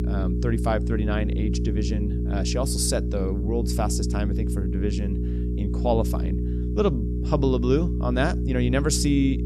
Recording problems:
electrical hum; loud; throughout; 60 Hz, 8 dB below the speech

